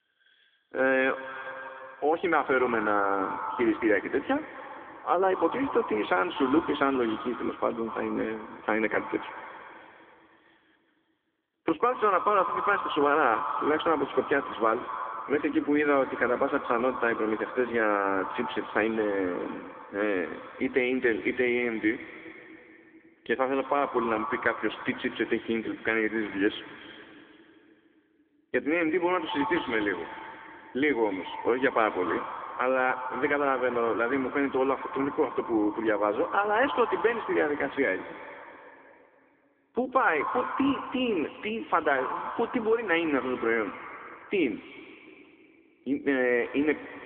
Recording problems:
echo of what is said; strong; throughout; 120 ms later, 10 dB below the speech
phone-call audio; nothing above 3.5 kHz

